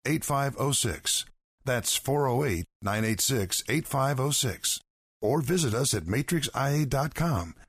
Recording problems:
none

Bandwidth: 15 kHz